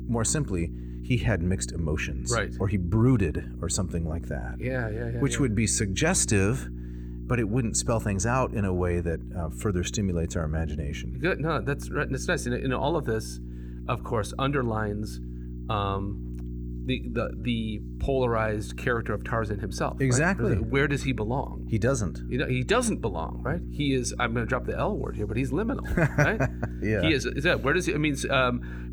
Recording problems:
electrical hum; noticeable; throughout; 60 Hz, 20 dB below the speech

